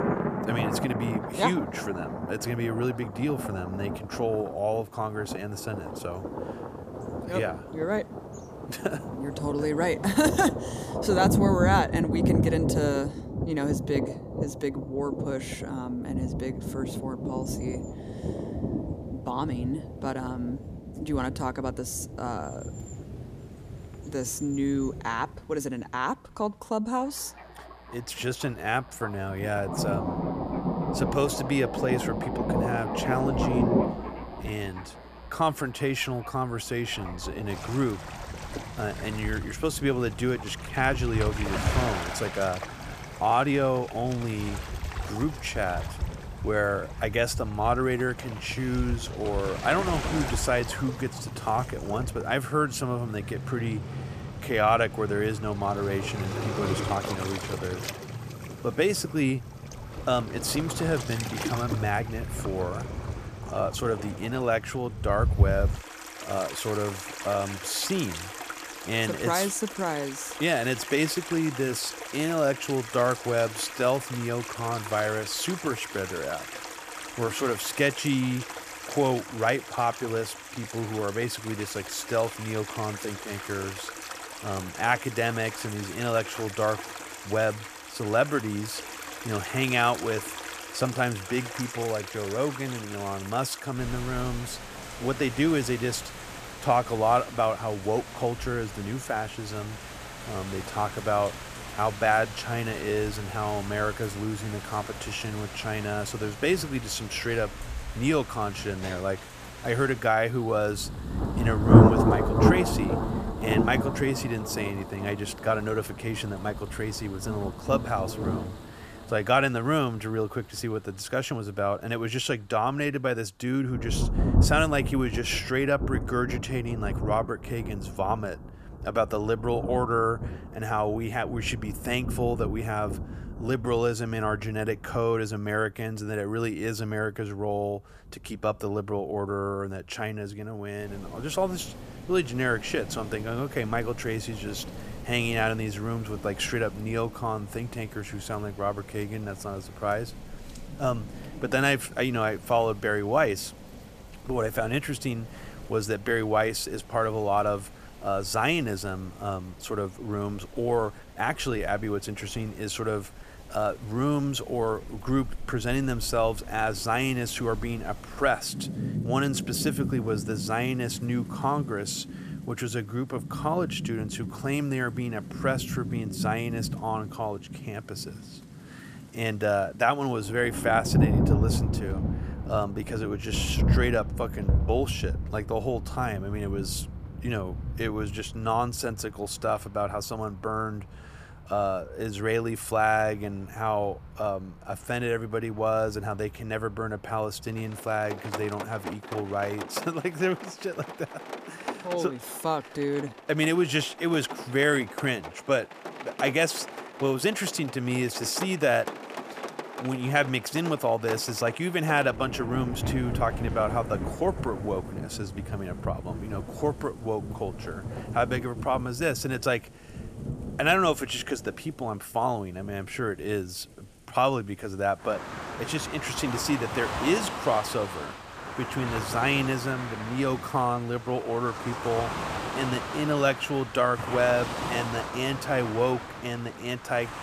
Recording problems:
rain or running water; loud; throughout; 5 dB below the speech

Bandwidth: 14.5 kHz